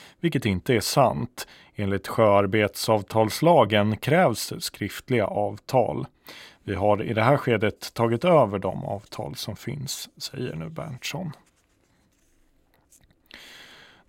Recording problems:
none

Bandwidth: 16 kHz